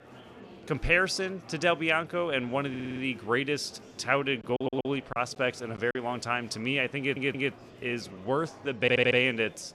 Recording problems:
murmuring crowd; faint; throughout; 20 dB below the speech
audio stuttering; 4 times, first at 2.5 s
choppy; very; from 4.5 to 6 s; 6% of the speech affected

